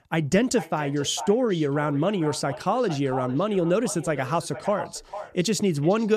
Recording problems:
echo of what is said; noticeable; throughout; 450 ms later, 15 dB below the speech
abrupt cut into speech; at the end

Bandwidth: 14.5 kHz